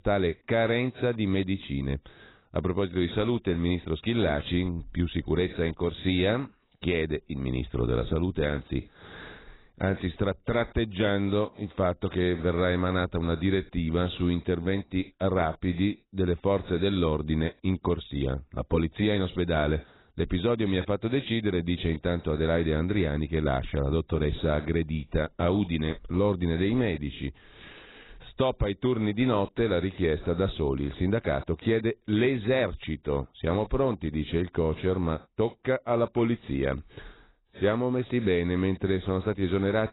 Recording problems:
garbled, watery; badly; nothing above 4 kHz

